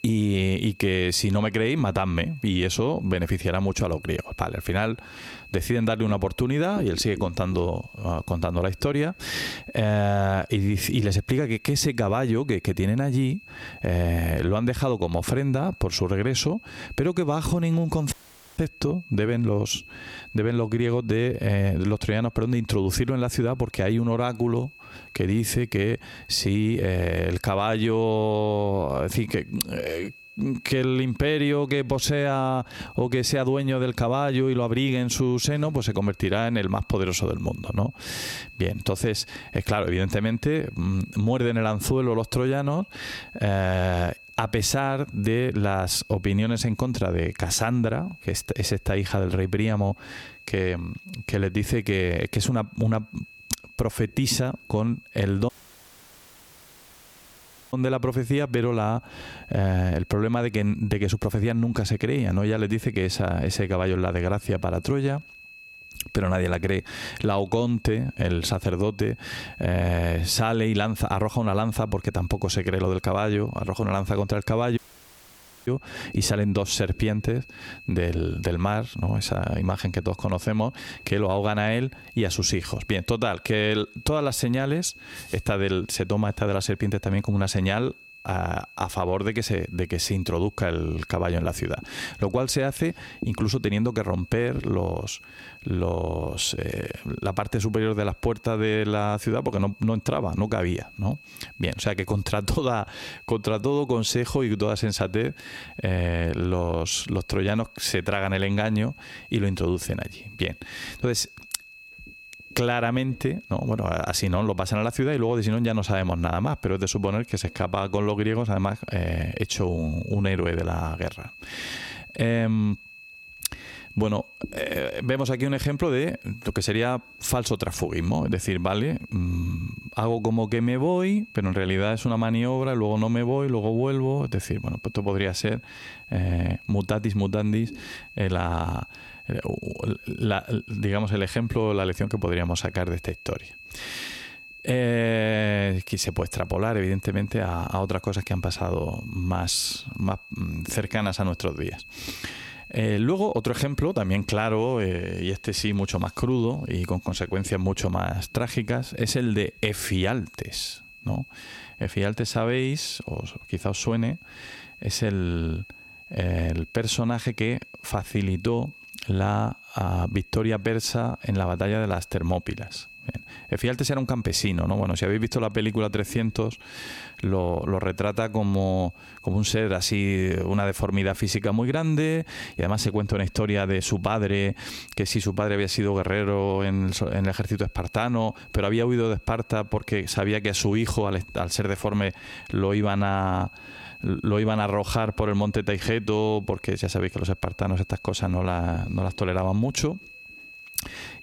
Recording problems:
squashed, flat; heavily
high-pitched whine; faint; throughout; 2.5 kHz, 20 dB below the speech
audio cutting out; at 18 s, at 55 s for 2 s and at 1:15 for 1 s

